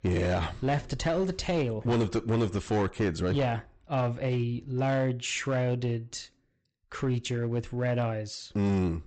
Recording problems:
high frequencies cut off; noticeable; nothing above 8 kHz
distortion; slight; 10% of the sound clipped

